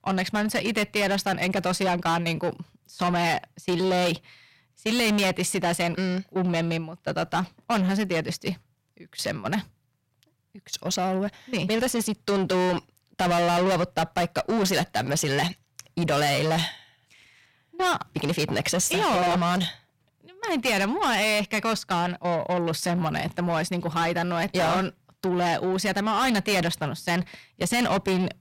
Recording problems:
distortion; heavy; 6 dB below the speech

